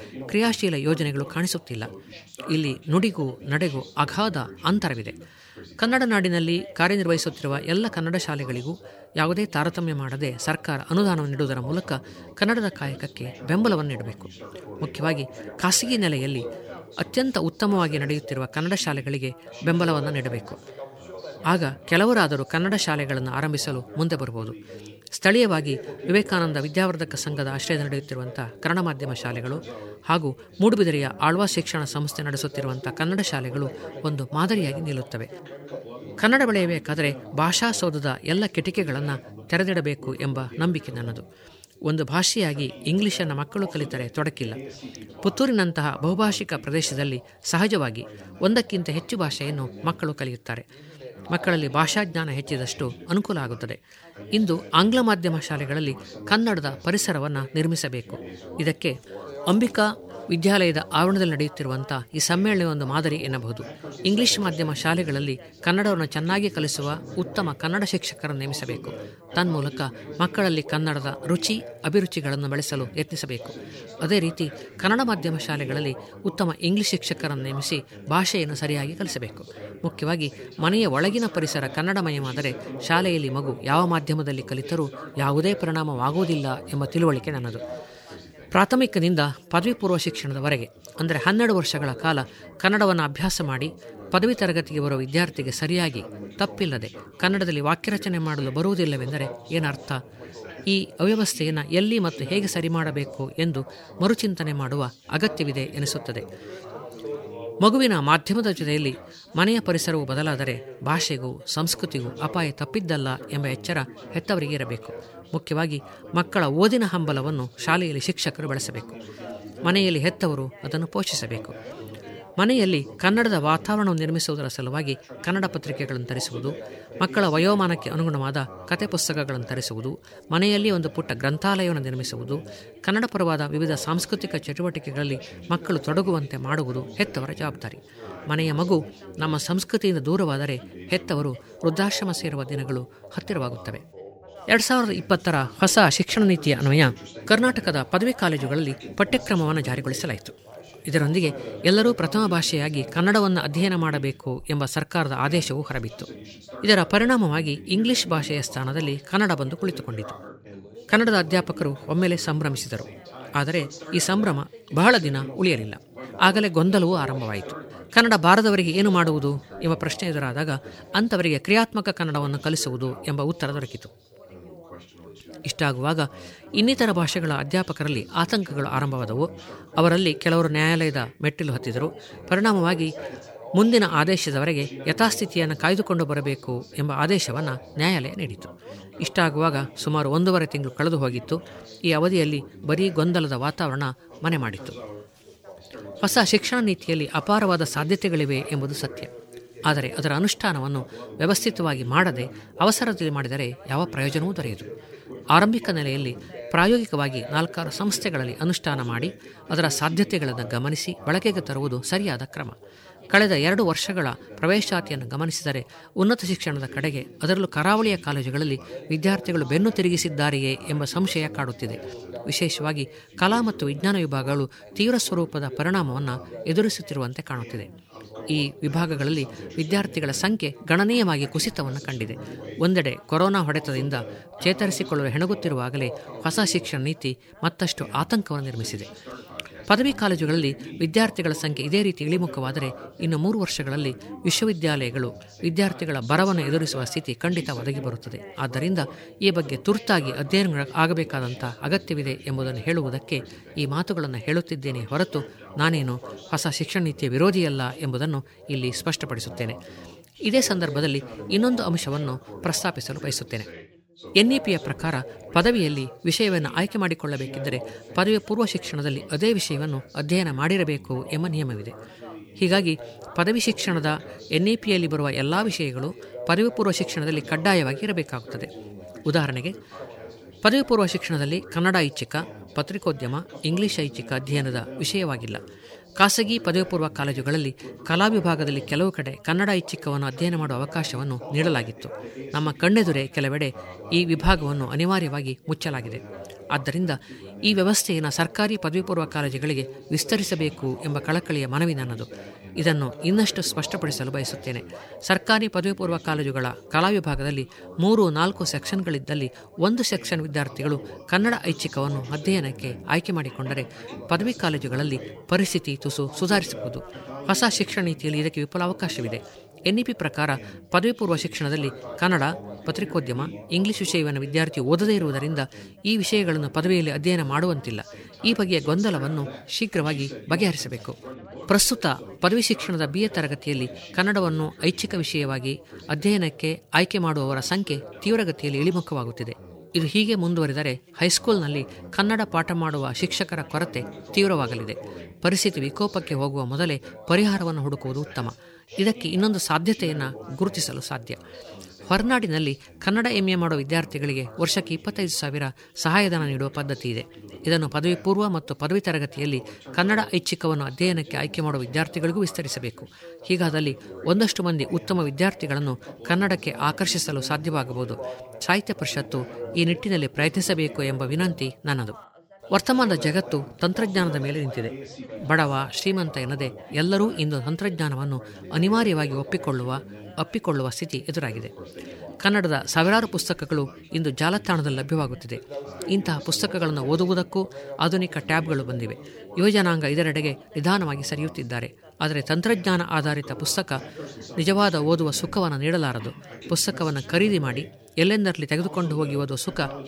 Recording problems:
background chatter; noticeable; throughout; 3 voices, 15 dB below the speech

